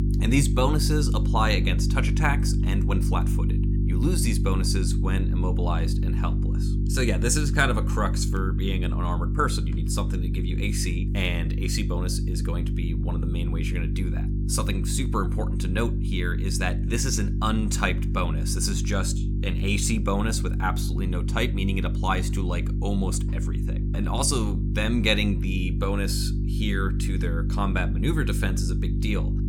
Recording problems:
electrical hum; loud; throughout; 50 Hz, 9 dB below the speech

